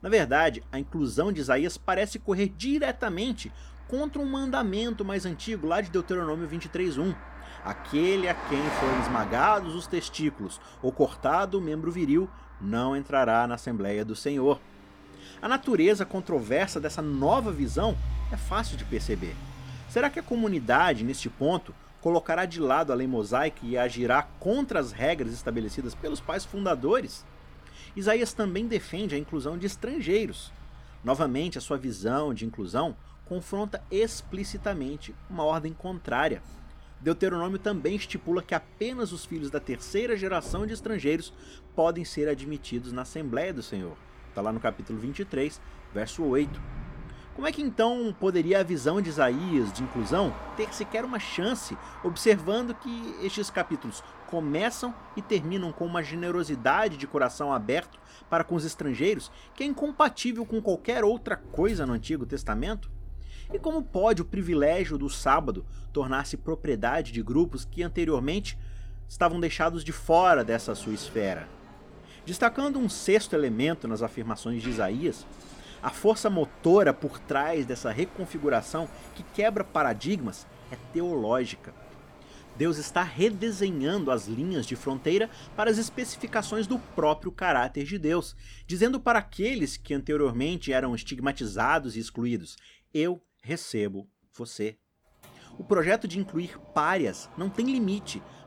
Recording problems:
traffic noise; noticeable; throughout; 15 dB below the speech

